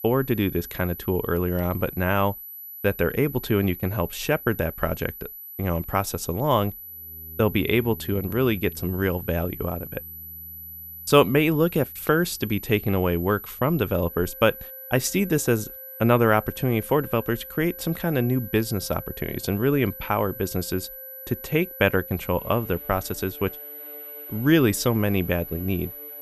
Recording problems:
high-pitched whine; noticeable; throughout; 12 kHz, 10 dB below the speech
background music; faint; from 7.5 s on; 25 dB below the speech

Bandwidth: 14.5 kHz